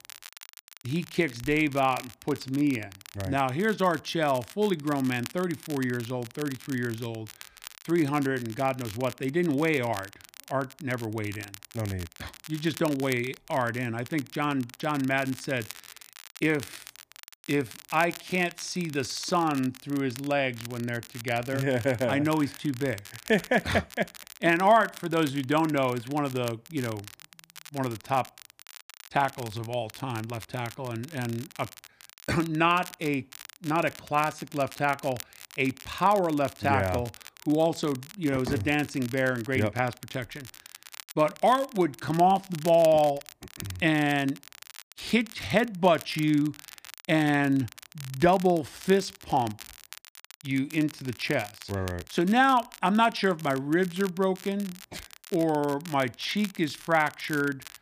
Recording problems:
crackle, like an old record; noticeable; 20 dB below the speech

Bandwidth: 15 kHz